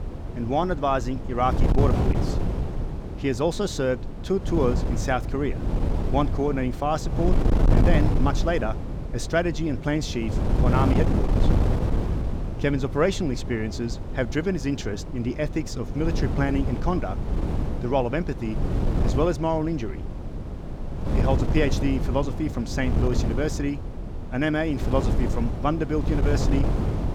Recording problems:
wind noise on the microphone; heavy; 7 dB below the speech

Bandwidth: 18.5 kHz